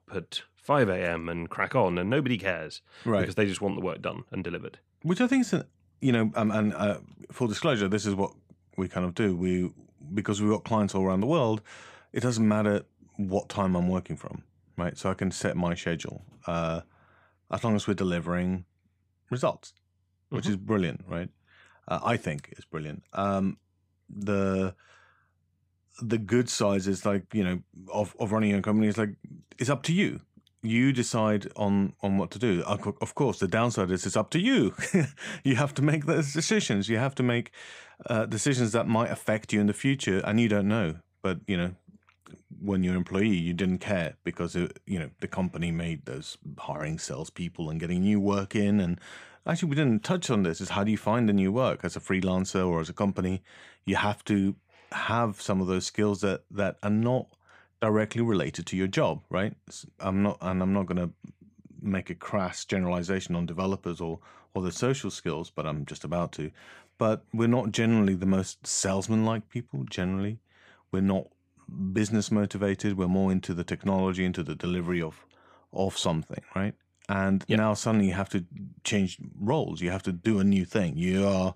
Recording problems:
none

